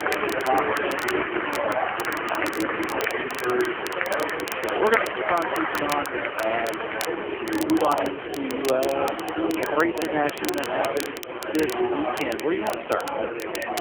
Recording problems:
phone-call audio; poor line; nothing above 3 kHz
murmuring crowd; very loud; throughout; as loud as the speech
crackle, like an old record; noticeable; 10 dB below the speech
animal sounds; faint; throughout; 25 dB below the speech

